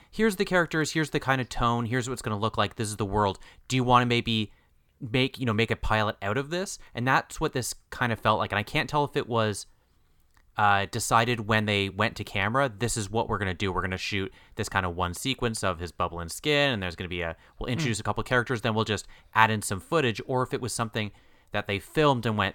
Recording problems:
none

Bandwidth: 17.5 kHz